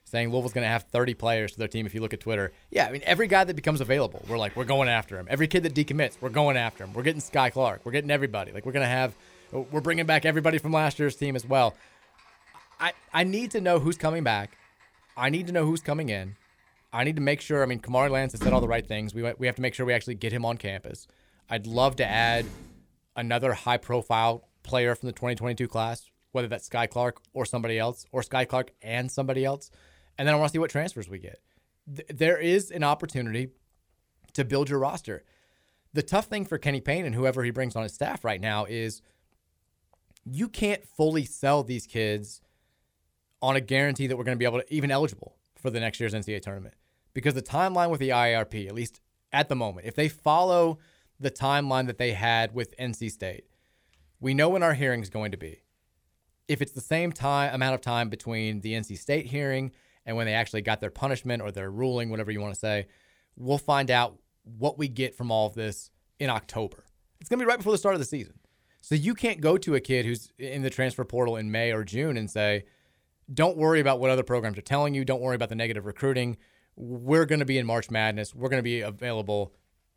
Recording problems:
household noises; noticeable; until 23 s; 15 dB below the speech

